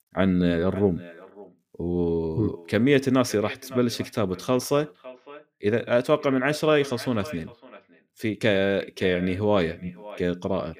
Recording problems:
echo of what is said; faint; throughout; 560 ms later, 20 dB below the speech

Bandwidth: 15 kHz